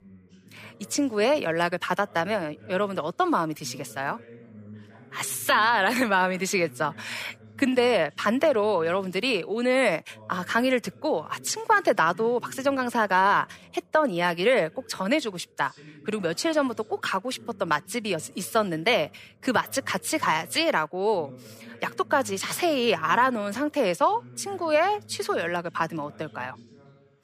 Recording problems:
voice in the background; faint; throughout; 25 dB below the speech

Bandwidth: 15 kHz